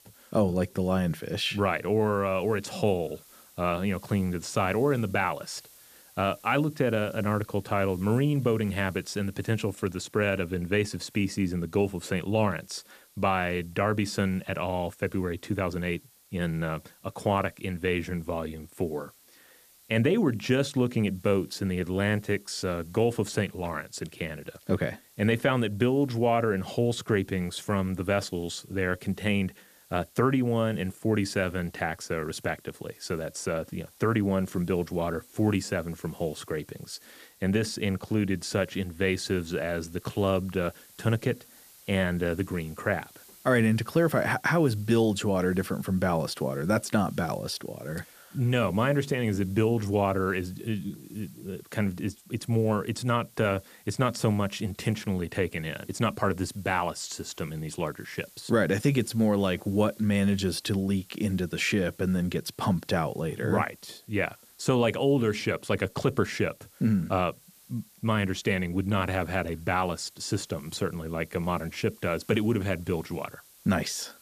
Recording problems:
hiss; faint; throughout; 25 dB below the speech

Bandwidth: 14.5 kHz